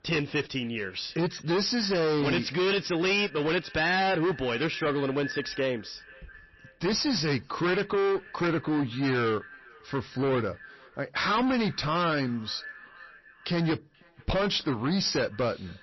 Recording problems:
distortion; heavy; 19% of the sound clipped
echo of what is said; faint; throughout; 480 ms later, 20 dB below the speech
garbled, watery; slightly; nothing above 5.5 kHz

